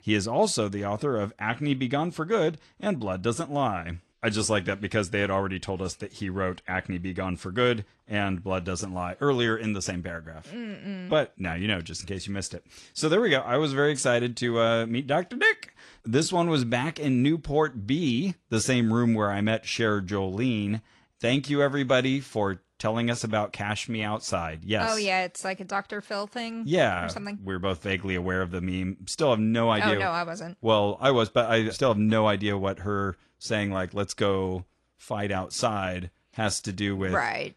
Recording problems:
garbled, watery; slightly

